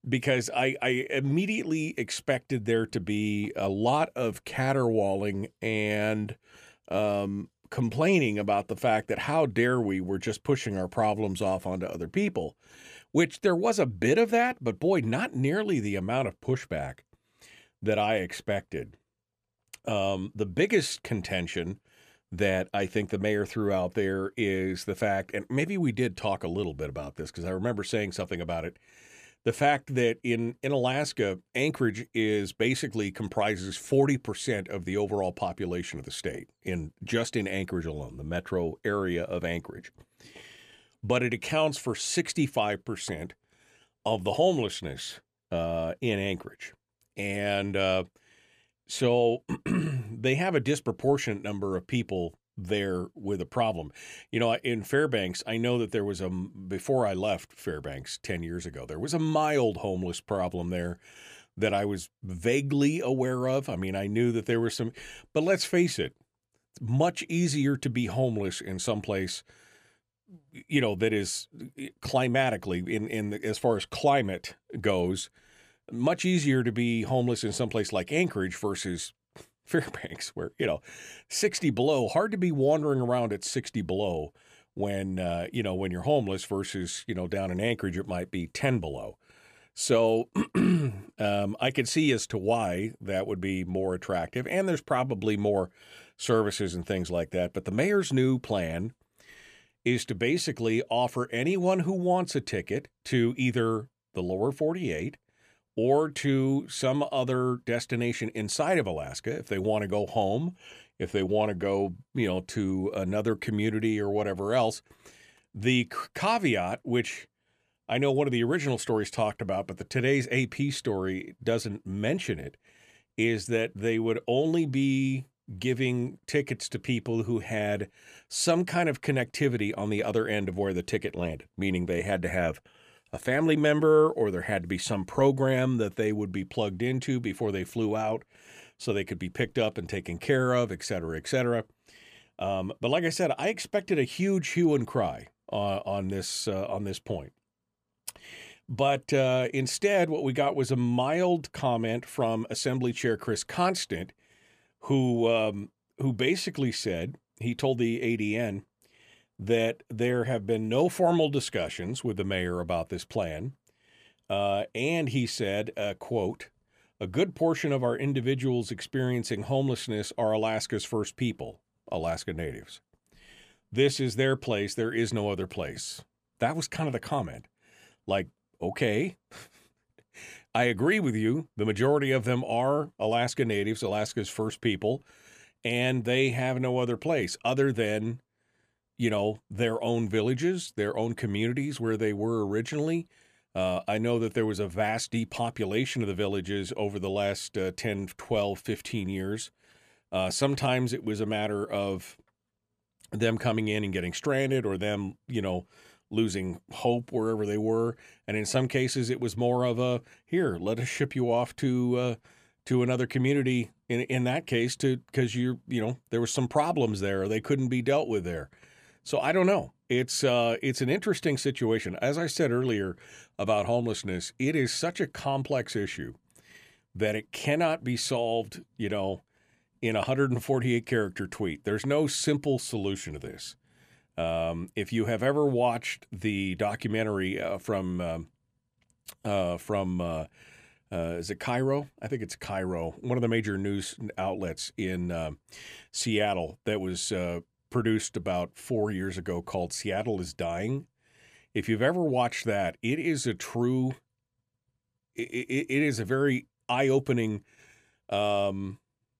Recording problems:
none

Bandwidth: 14.5 kHz